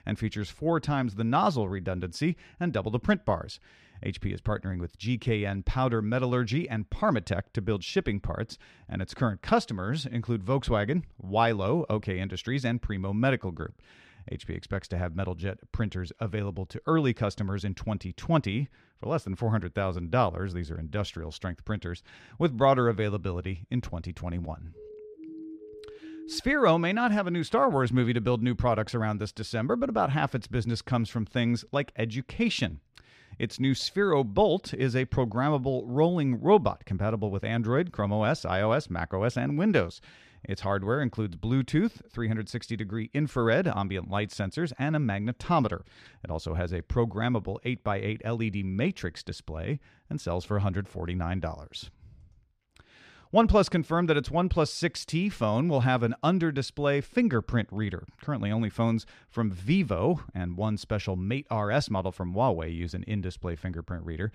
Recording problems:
muffled; slightly; fading above 3.5 kHz
siren; faint; from 25 to 26 s; peak 15 dB below the speech

